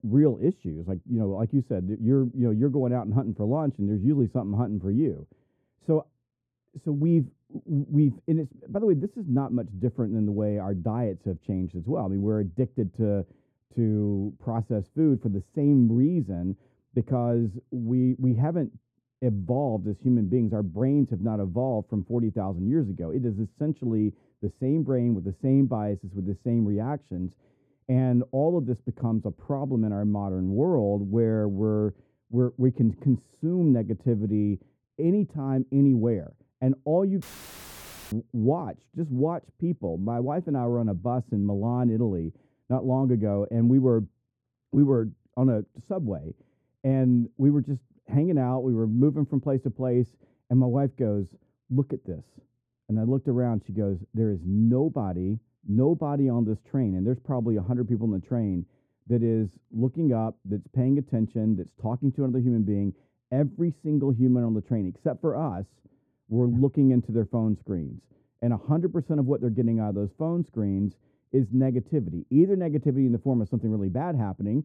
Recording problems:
muffled; very; fading above 1 kHz
audio cutting out; filled with static; at 37 s for 1 s

